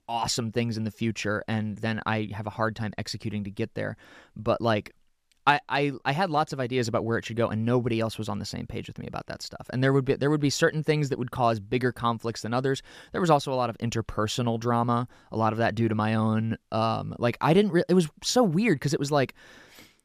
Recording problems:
none

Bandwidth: 14.5 kHz